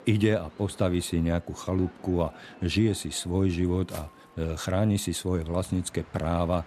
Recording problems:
train or aircraft noise; faint; throughout; 25 dB below the speech
footsteps; faint; at 4 s; peak 20 dB below the speech

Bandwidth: 13.5 kHz